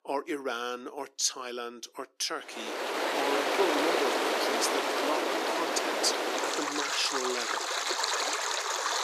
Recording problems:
thin; somewhat; fading below 300 Hz
rain or running water; very loud; from 2.5 s on; 5 dB above the speech

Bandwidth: 14.5 kHz